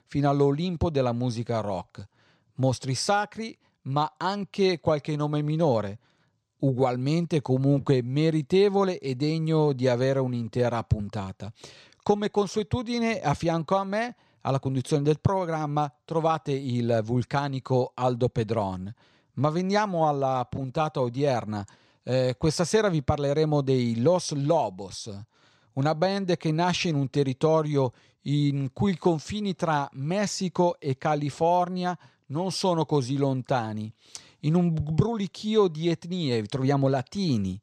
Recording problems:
none

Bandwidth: 13.5 kHz